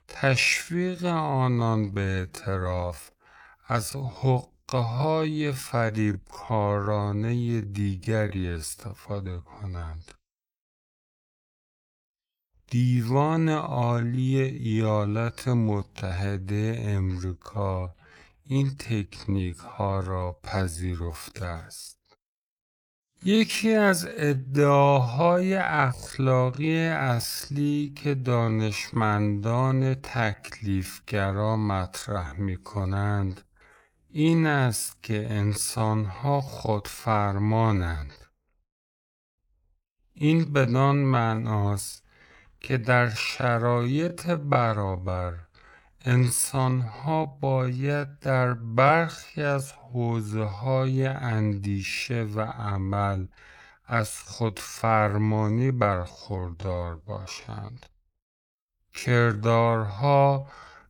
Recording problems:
wrong speed, natural pitch; too slow; 0.5 times normal speed

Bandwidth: 18.5 kHz